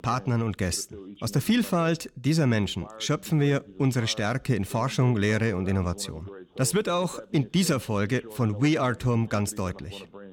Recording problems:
voice in the background; noticeable; throughout; 20 dB below the speech

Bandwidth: 17 kHz